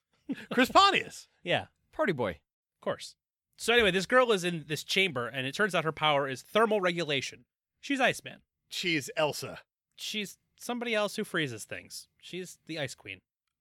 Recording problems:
none

